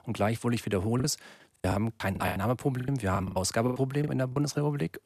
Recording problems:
choppy; very; 15% of the speech affected

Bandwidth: 14.5 kHz